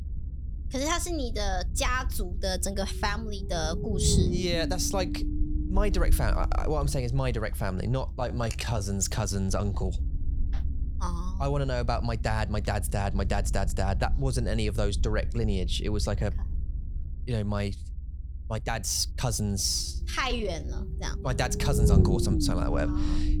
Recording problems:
low rumble; loud; throughout; 10 dB below the speech
uneven, jittery; strongly; from 8 to 21 s

